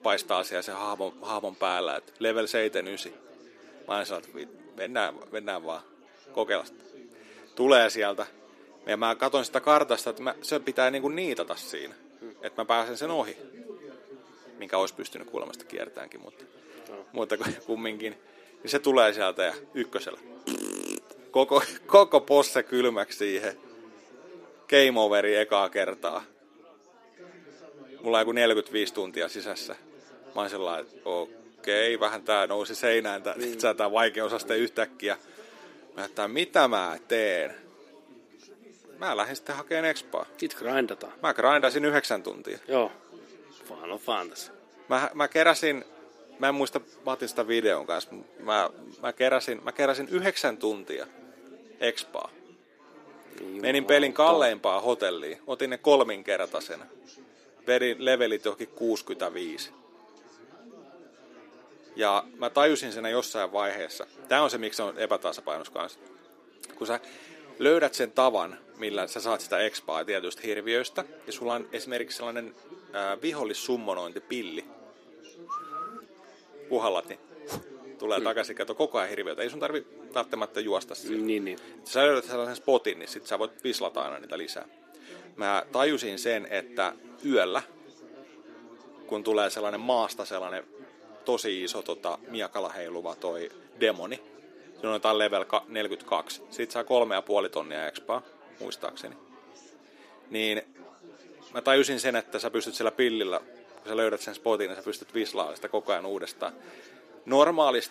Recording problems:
thin; somewhat; fading below 300 Hz
chatter from many people; faint; throughout; 25 dB below the speech

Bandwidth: 14.5 kHz